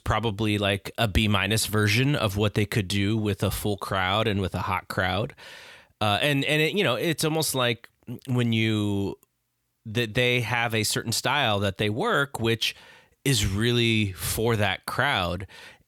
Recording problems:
none

